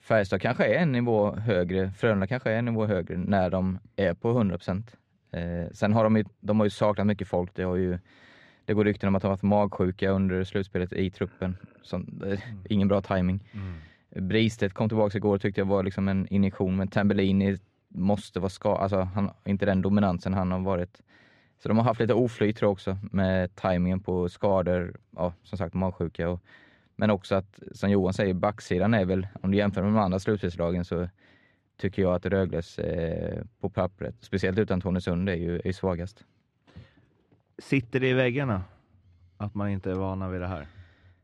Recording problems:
muffled; slightly; fading above 3 kHz

